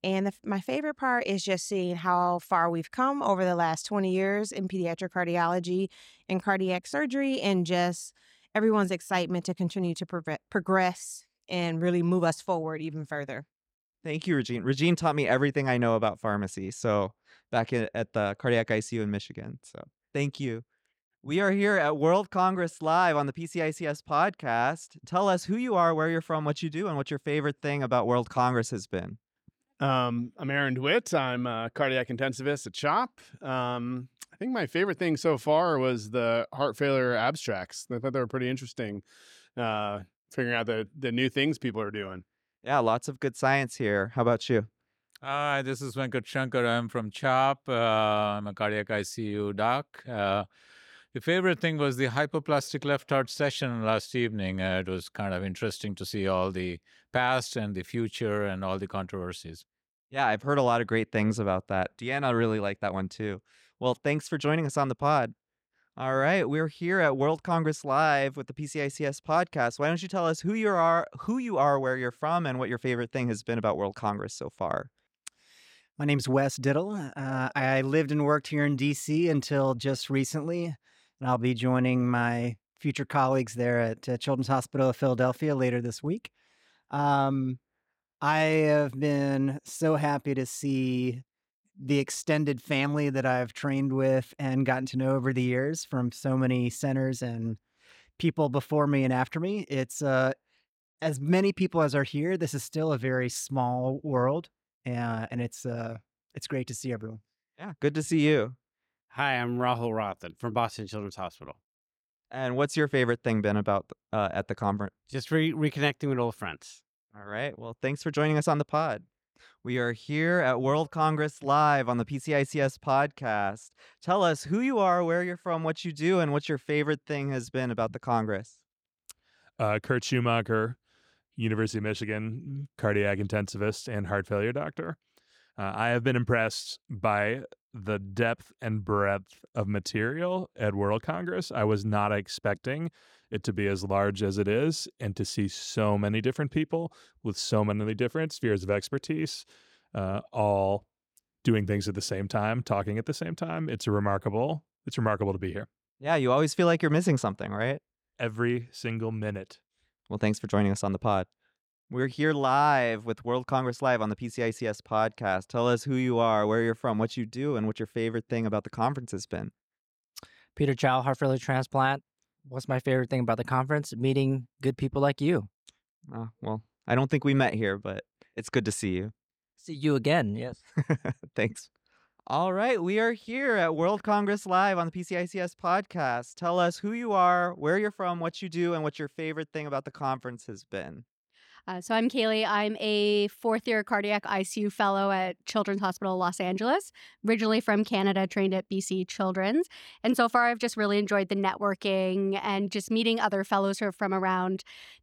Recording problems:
uneven, jittery; strongly; from 9.5 s to 3:11

